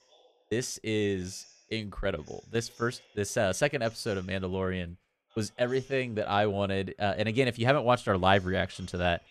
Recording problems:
voice in the background; faint; throughout; 30 dB below the speech

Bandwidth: 14 kHz